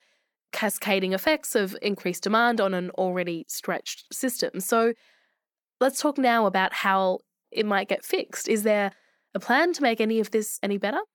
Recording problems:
none

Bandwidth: 18.5 kHz